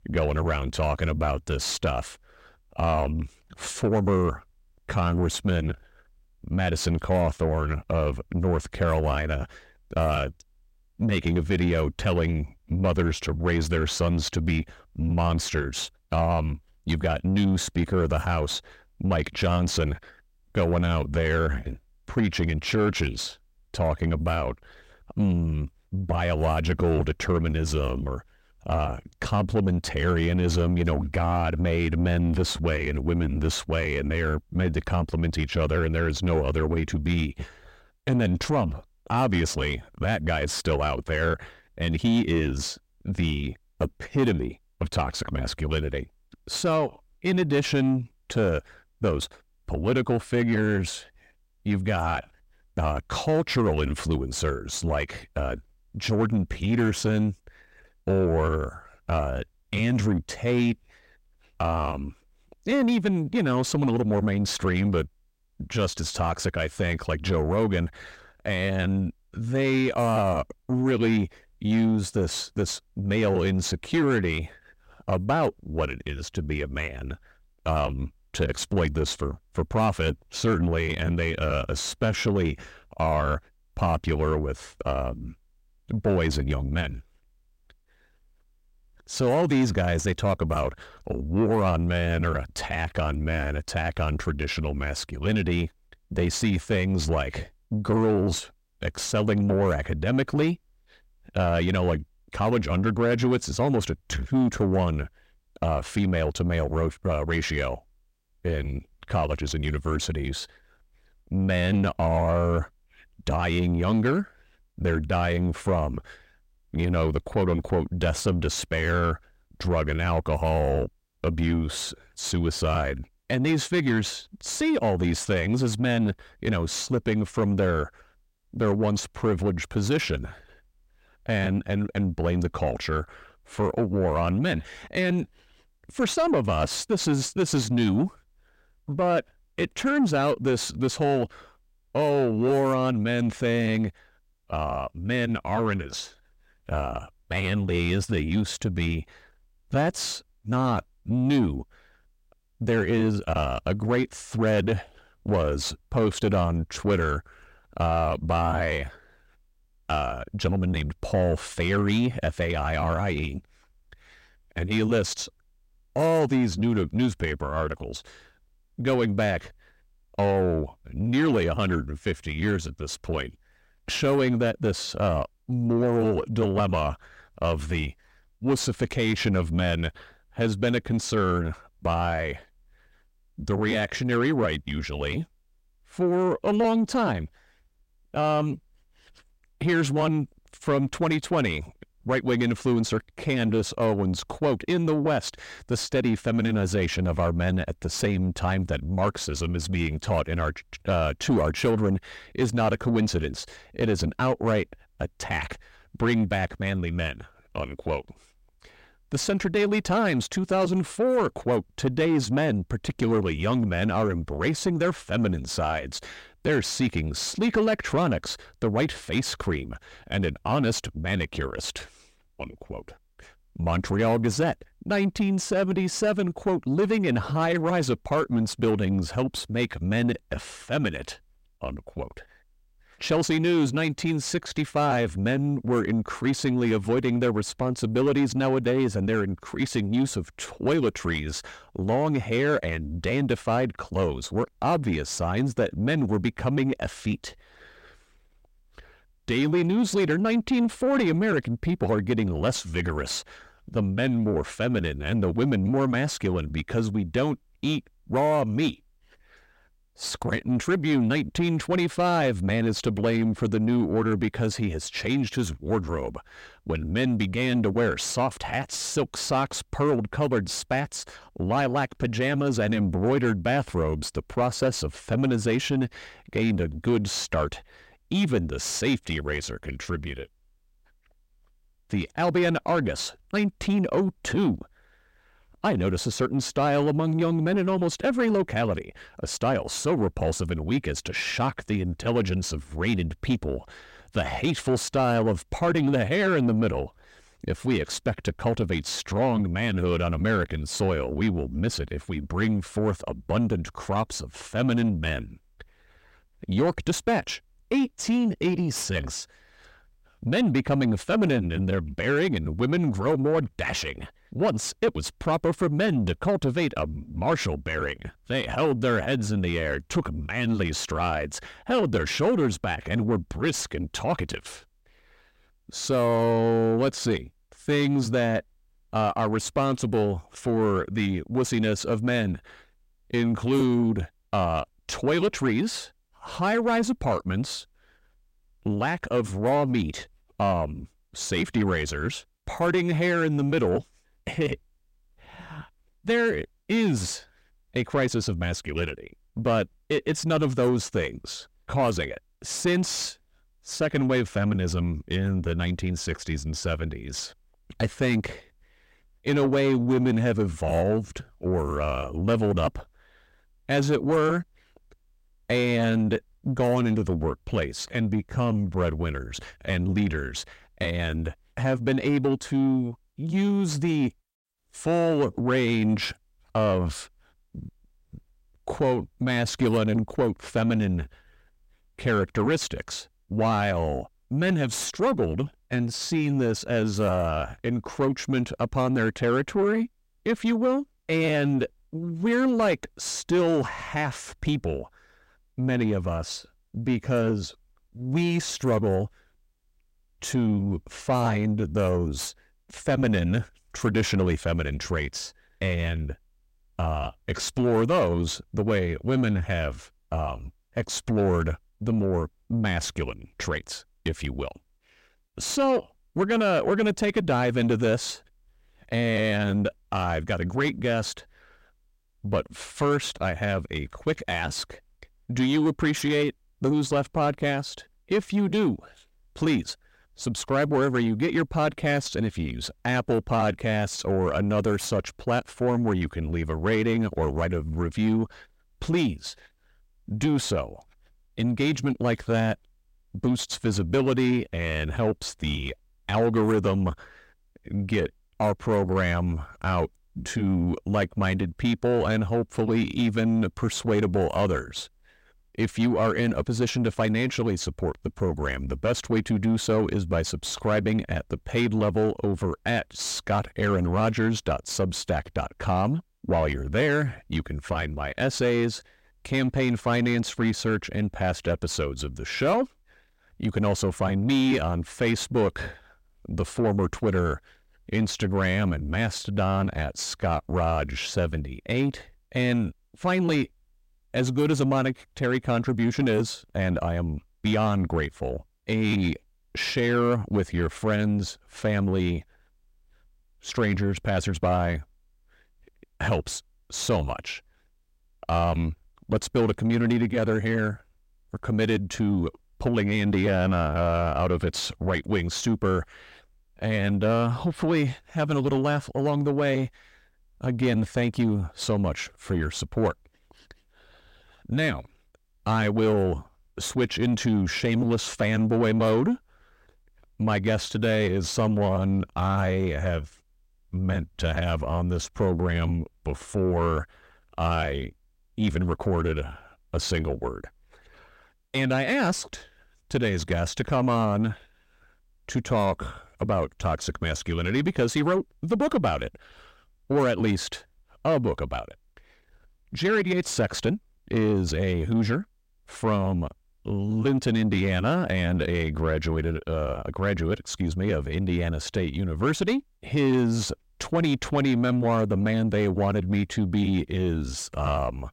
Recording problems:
distortion; slight; 10 dB below the speech

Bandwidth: 16 kHz